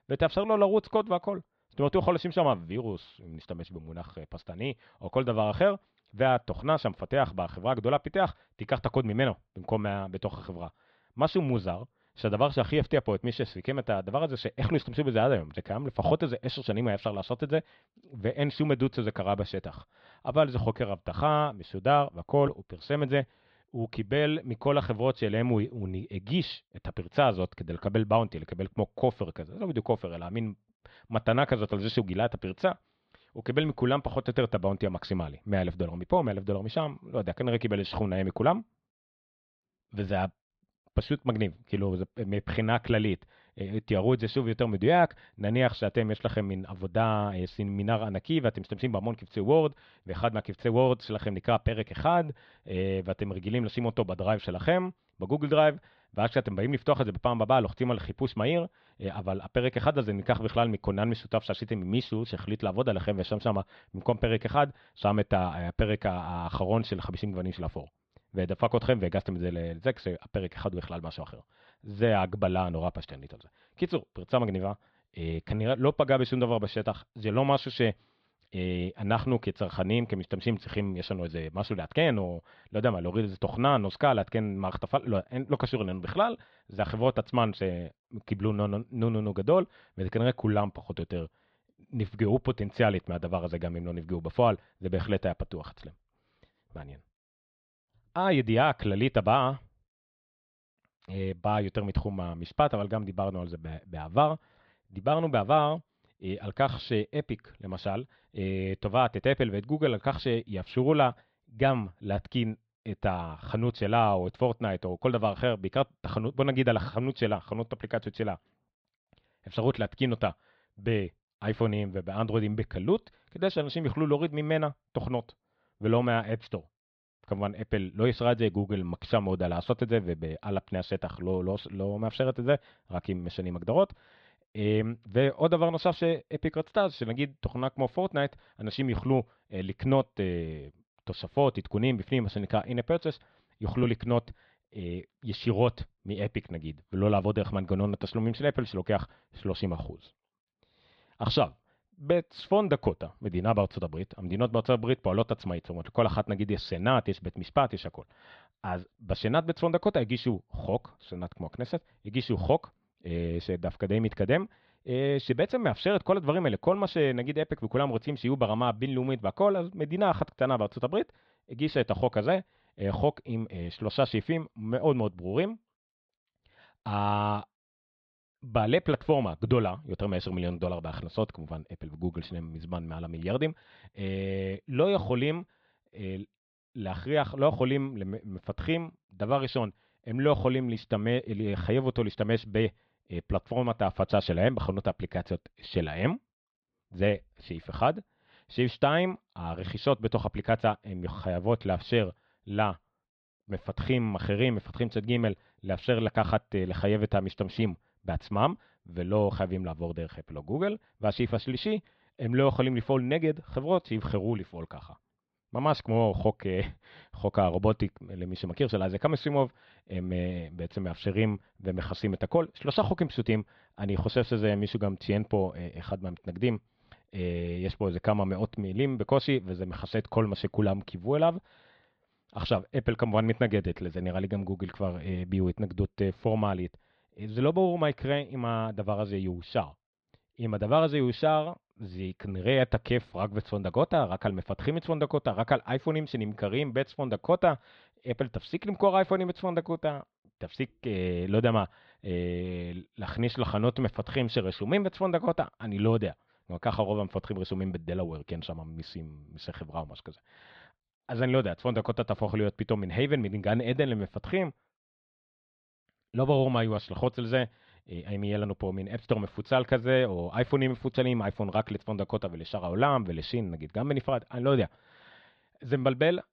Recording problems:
muffled; slightly; fading above 4 kHz

